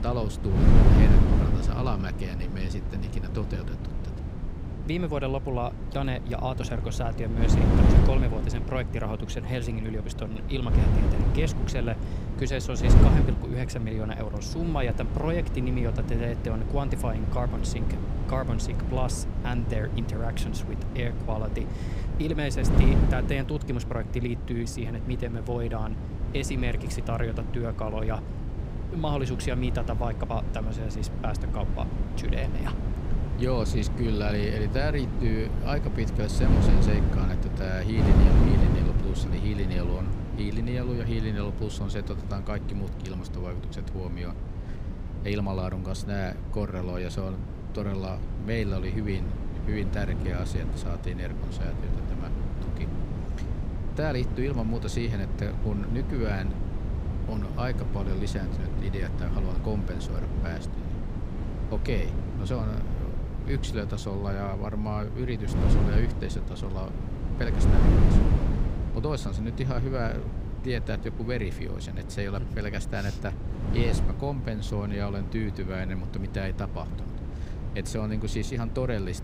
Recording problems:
wind noise on the microphone; heavy; 4 dB below the speech

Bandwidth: 15.5 kHz